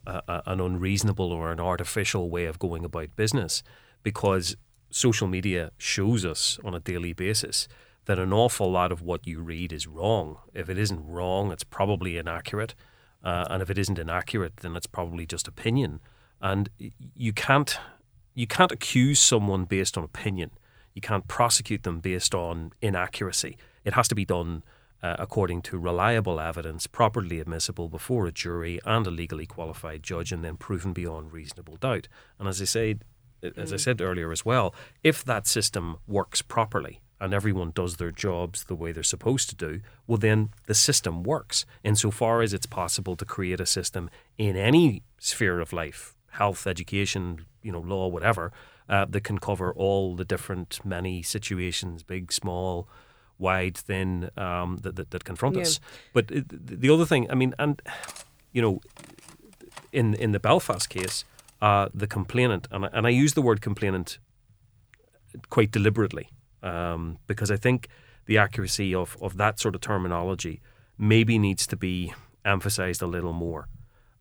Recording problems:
uneven, jittery; strongly; from 11 to 56 s
clattering dishes; noticeable; from 58 s to 1:01; peak 10 dB below the speech

